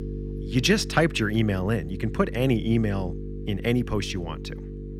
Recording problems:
electrical hum; noticeable; throughout; 50 Hz, 15 dB below the speech

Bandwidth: 18.5 kHz